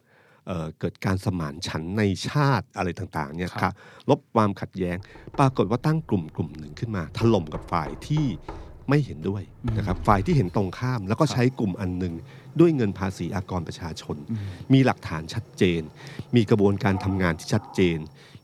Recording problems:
household noises; noticeable; from 5.5 s on; 20 dB below the speech

